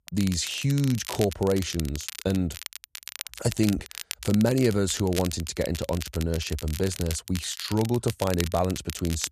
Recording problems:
crackle, like an old record; noticeable; 10 dB below the speech

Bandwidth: 14.5 kHz